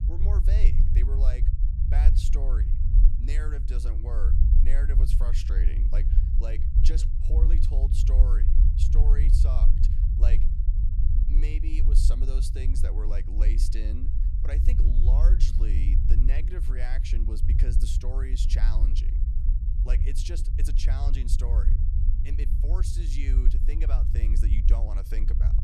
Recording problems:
low rumble; loud; throughout; 3 dB below the speech

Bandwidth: 14 kHz